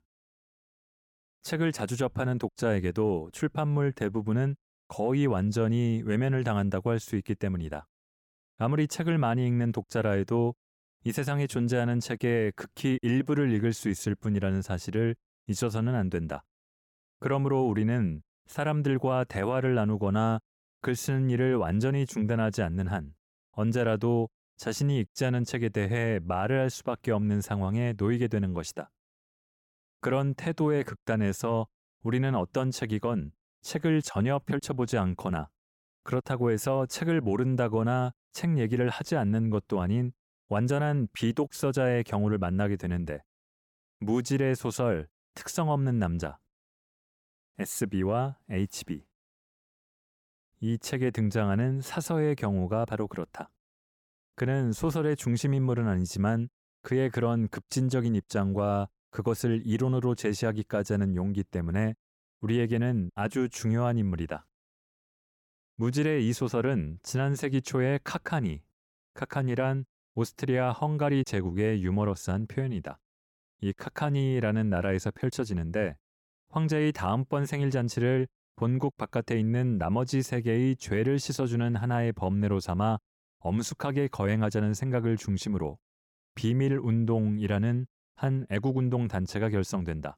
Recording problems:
none

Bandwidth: 17 kHz